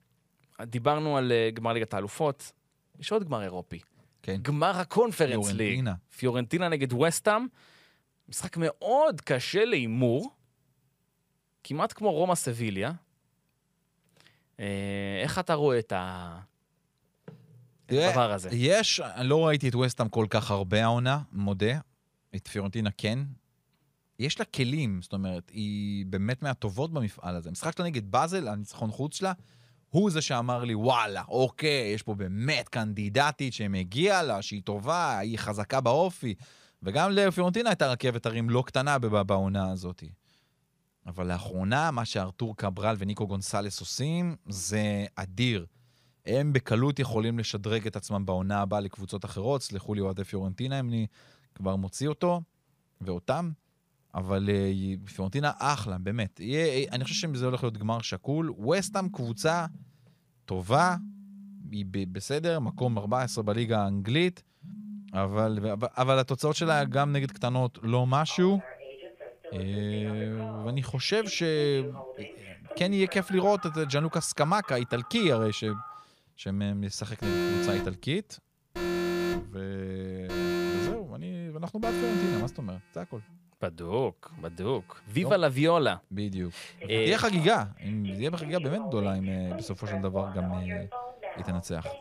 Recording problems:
alarms or sirens; loud; from 56 s on; 9 dB below the speech

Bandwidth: 15 kHz